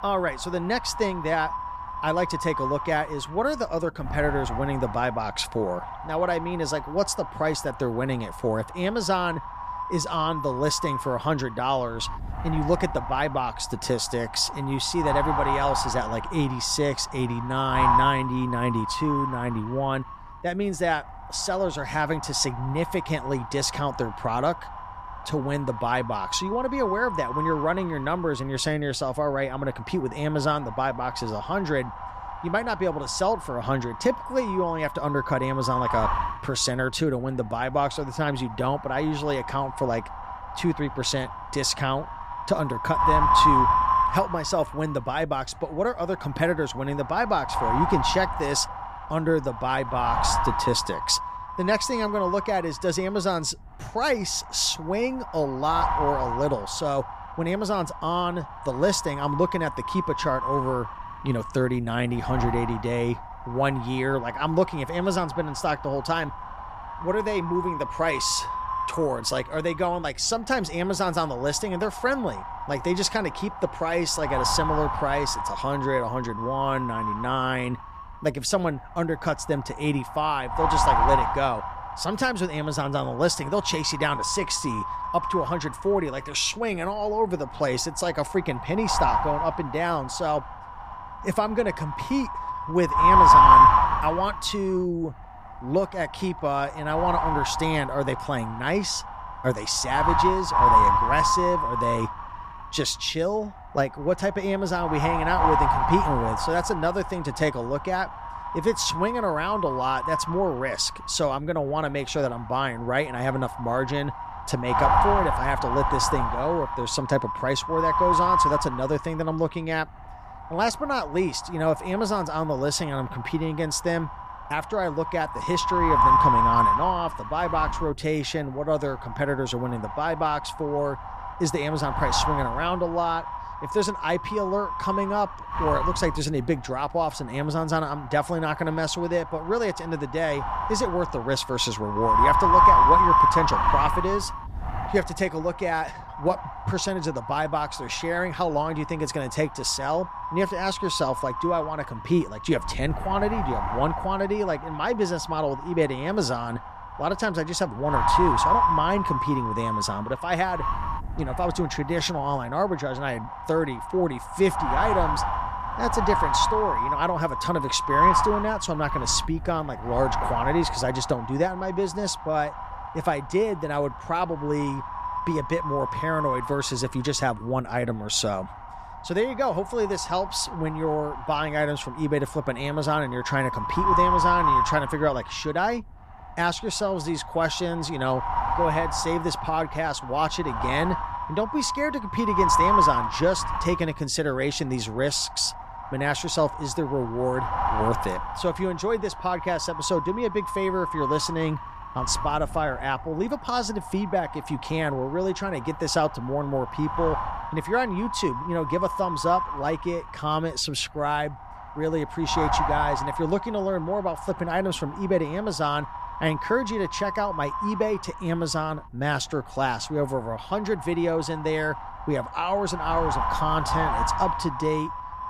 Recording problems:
wind noise on the microphone; heavy; 3 dB above the speech

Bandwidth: 14.5 kHz